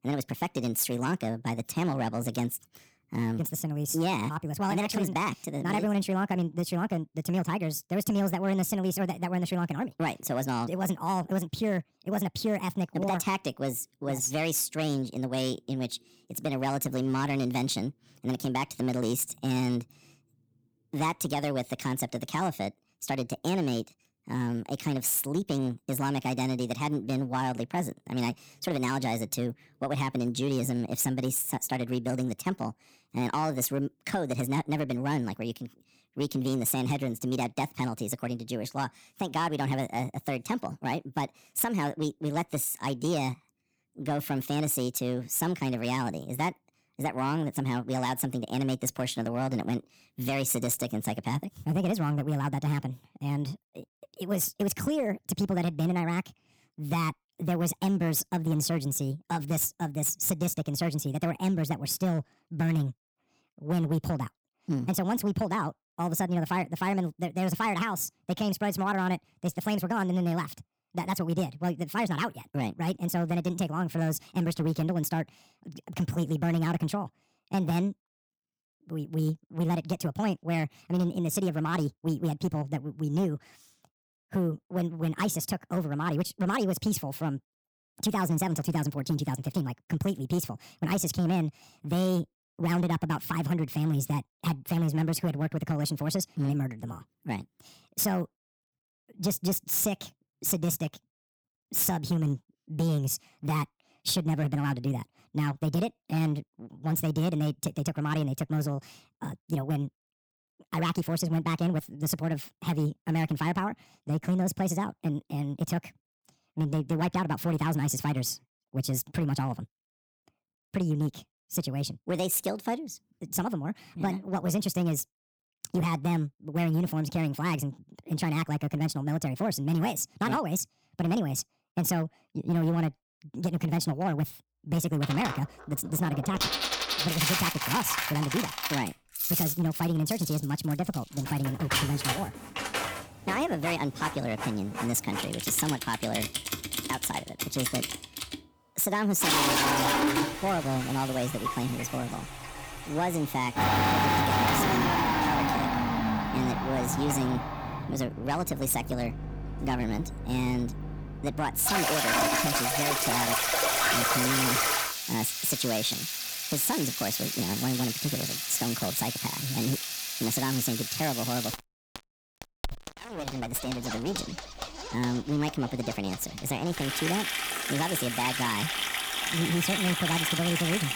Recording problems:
wrong speed and pitch; too fast and too high; 1.5 times normal speed
distortion; slight; 6% of the sound clipped
household noises; very loud; from 2:15 on; 1 dB above the speech

